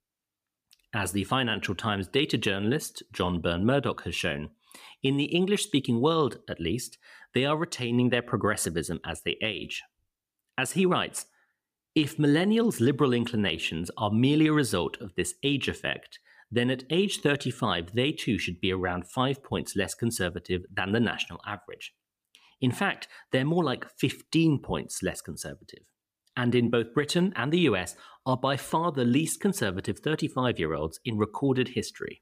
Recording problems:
none

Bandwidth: 15 kHz